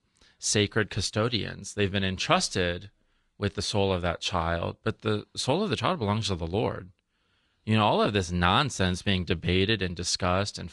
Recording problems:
garbled, watery; slightly; nothing above 10 kHz

